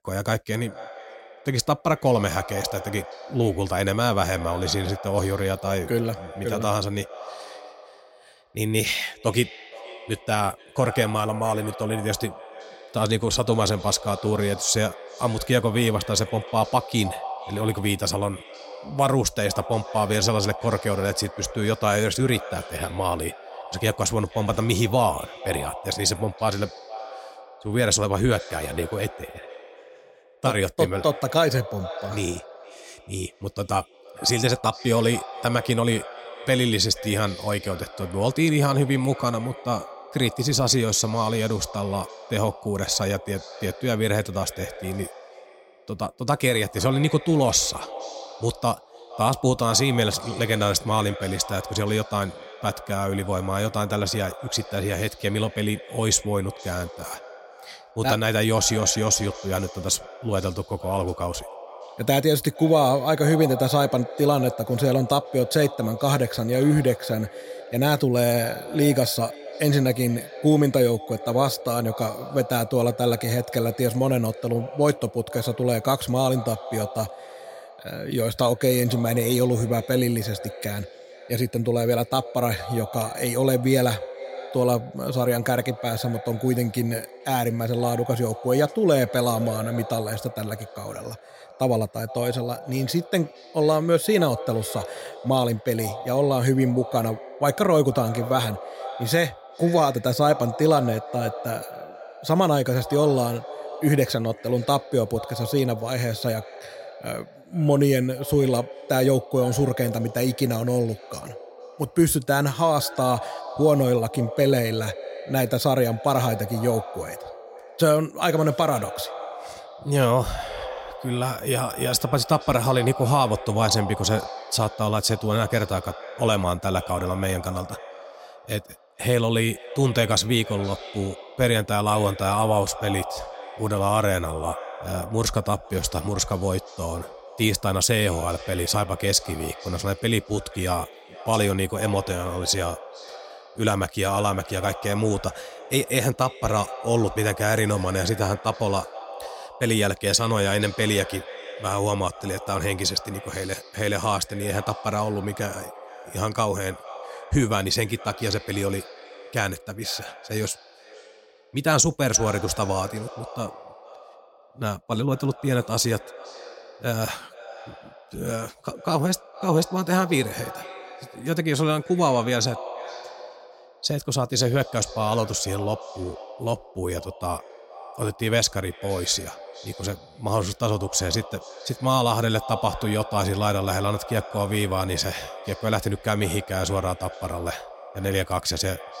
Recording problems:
echo of what is said; noticeable; throughout; 470 ms later, 15 dB below the speech

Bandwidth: 16 kHz